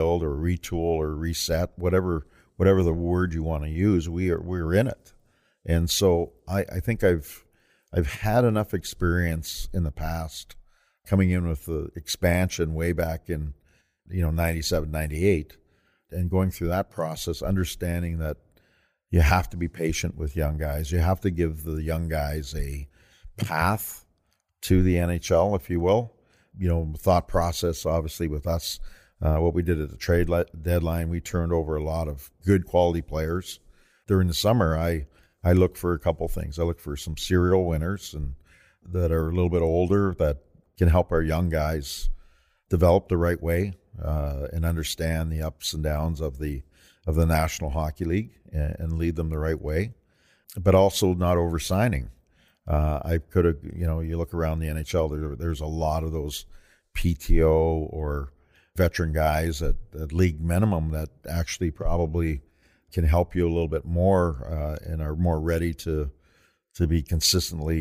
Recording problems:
abrupt cut into speech; at the start and the end

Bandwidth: 15 kHz